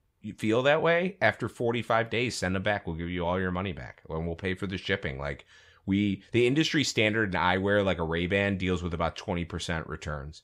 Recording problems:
none

